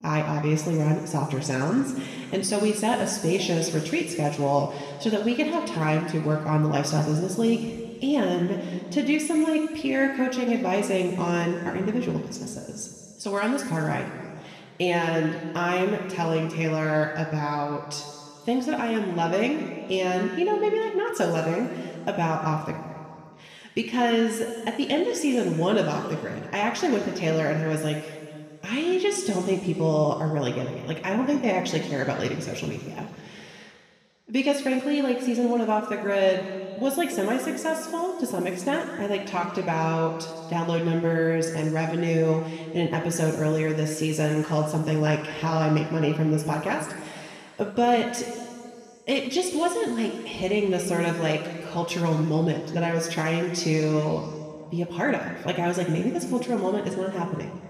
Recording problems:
room echo; noticeable; dies away in 2.1 s
off-mic speech; somewhat distant

